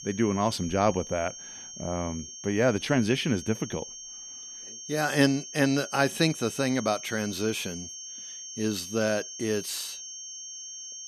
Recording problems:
high-pitched whine; noticeable; throughout; 6.5 kHz, 10 dB below the speech

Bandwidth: 14 kHz